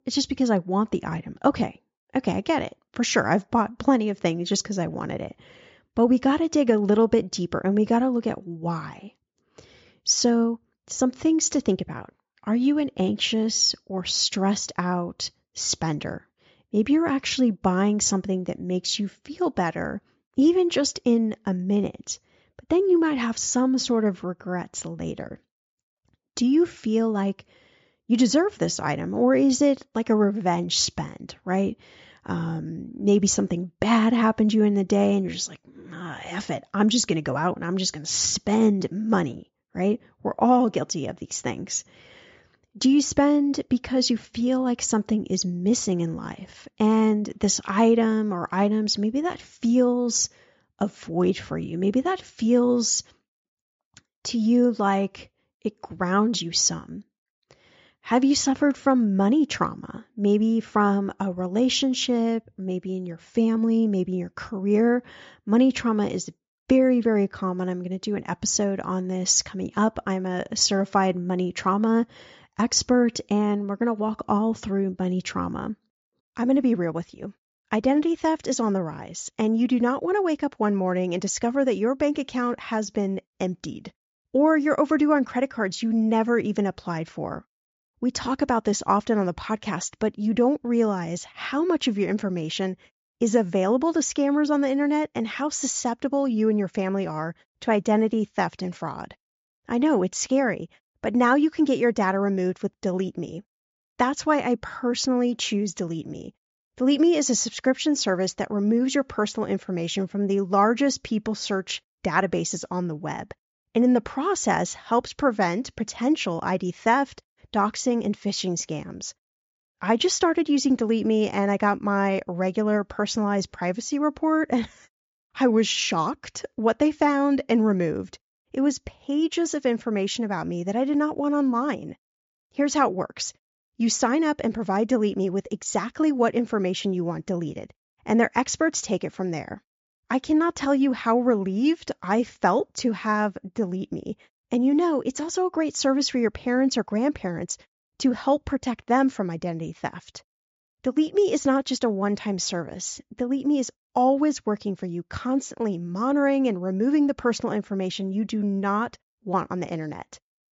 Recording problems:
high frequencies cut off; noticeable; nothing above 7.5 kHz

